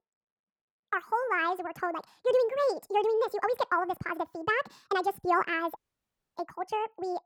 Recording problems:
wrong speed and pitch; too fast and too high; 1.7 times normal speed
muffled; slightly; fading above 2.5 kHz
audio cutting out; at 6 s for 0.5 s

